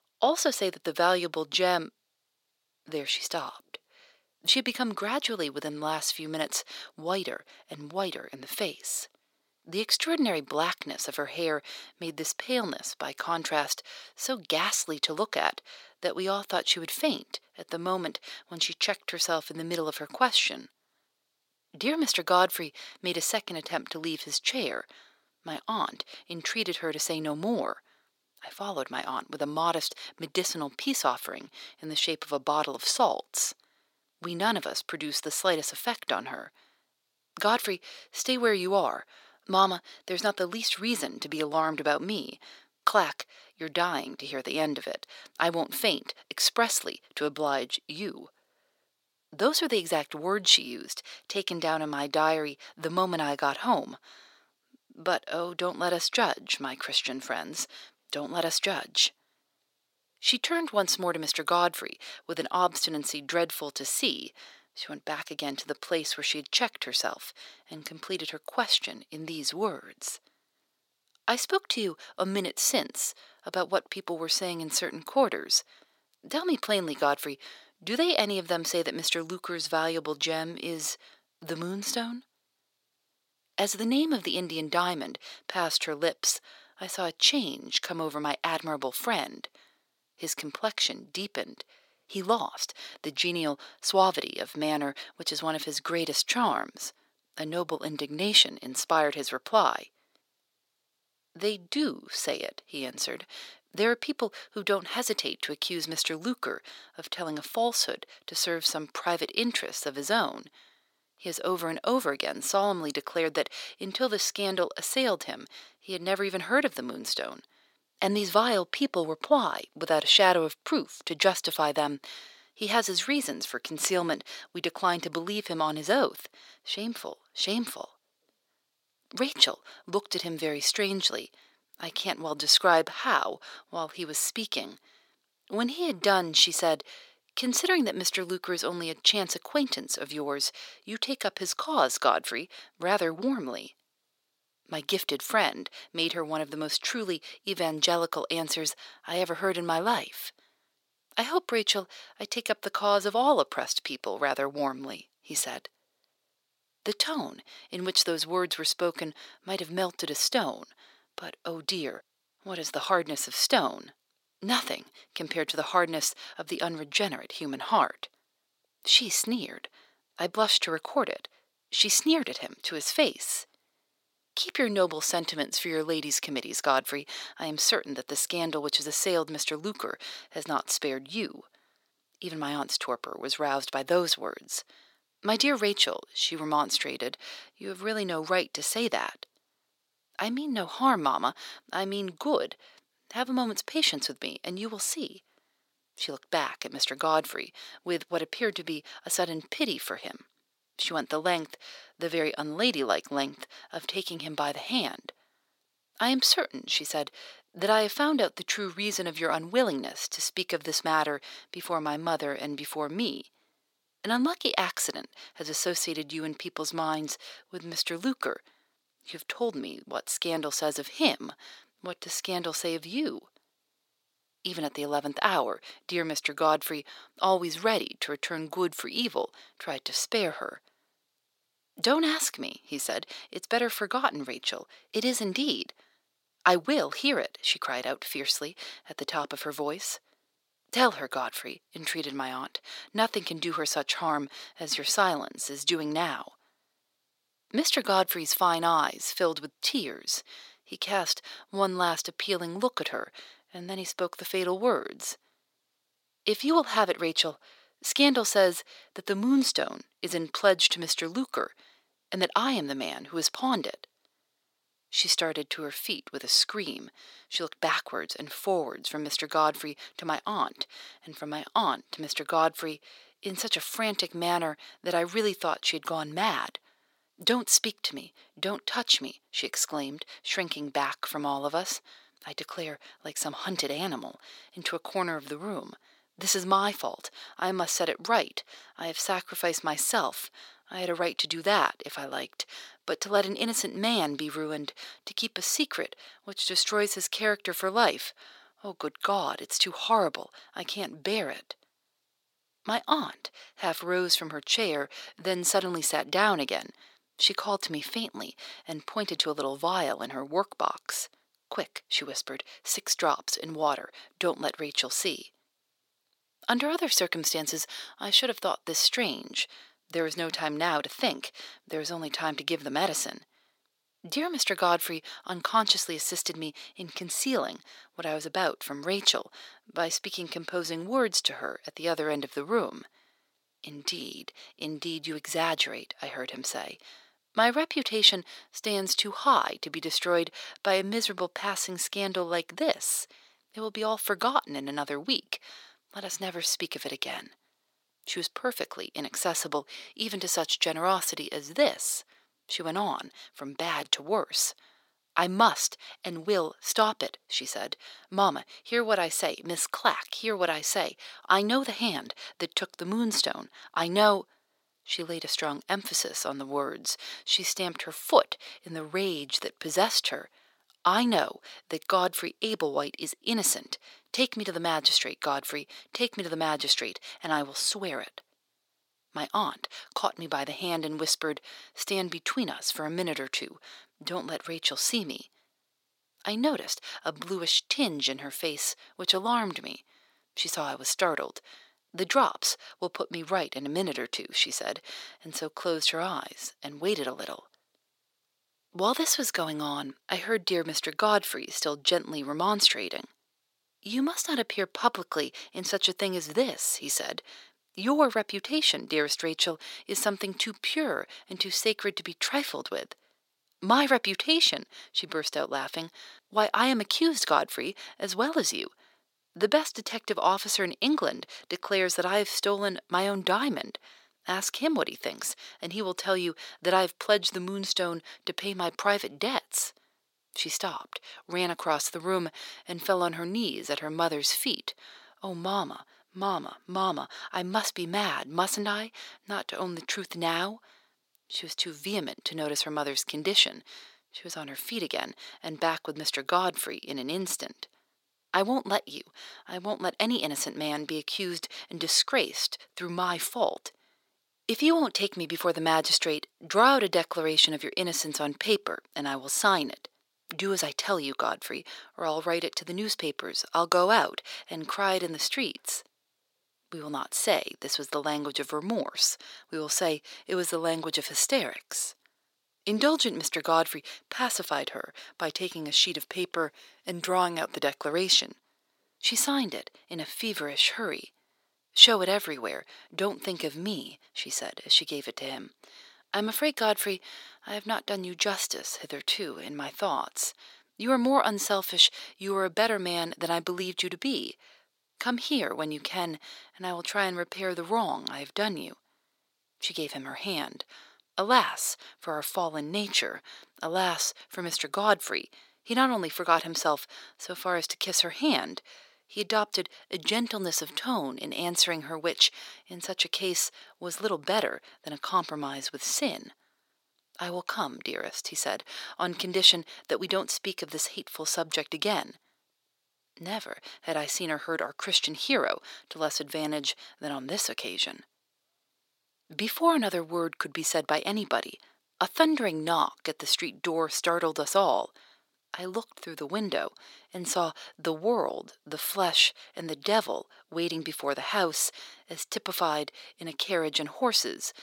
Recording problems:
thin; somewhat; fading below 500 Hz

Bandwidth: 16.5 kHz